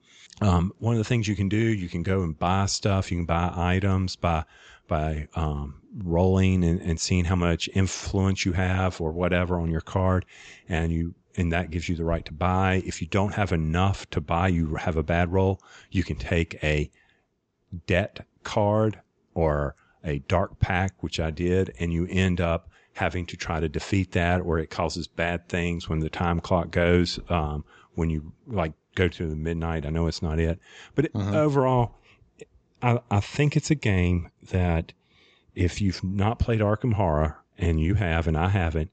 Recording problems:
high frequencies cut off; noticeable; nothing above 8 kHz

